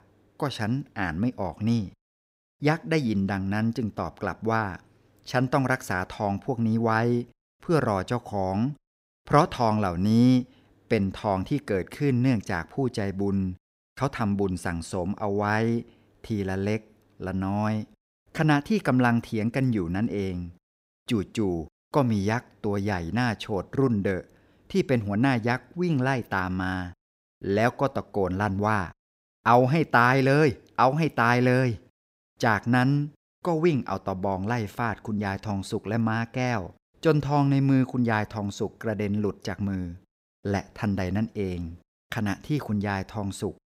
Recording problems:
none

